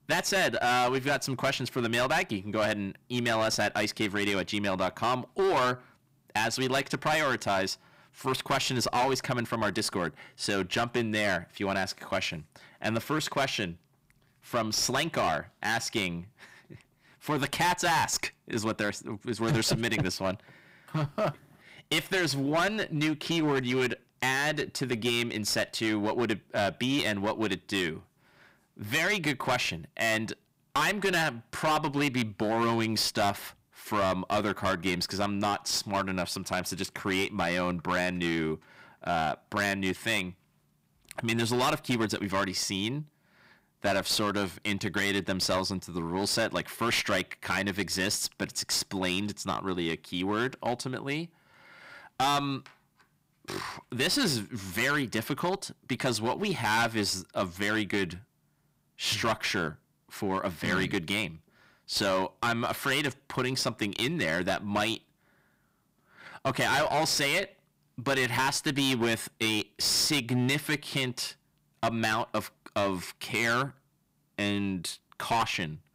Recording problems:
distortion; heavy; 11% of the sound clipped

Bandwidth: 15.5 kHz